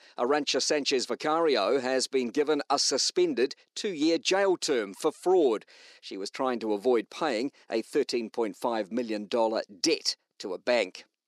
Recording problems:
thin; somewhat; fading below 300 Hz

